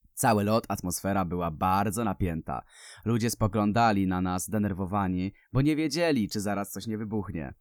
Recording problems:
none

